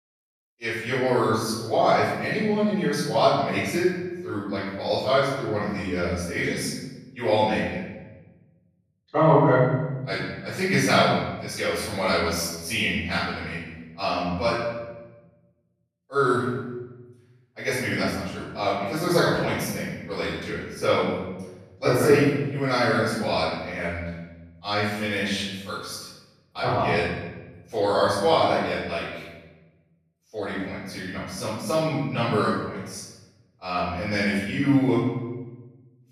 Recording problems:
room echo; strong; dies away in 1.1 s
off-mic speech; far

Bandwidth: 14 kHz